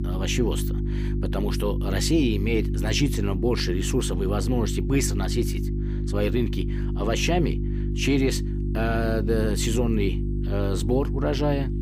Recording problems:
electrical hum; loud; throughout; 50 Hz, 9 dB below the speech

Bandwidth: 15 kHz